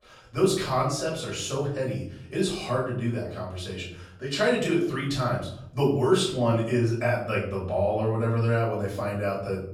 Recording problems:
off-mic speech; far
room echo; noticeable; dies away in 0.8 s

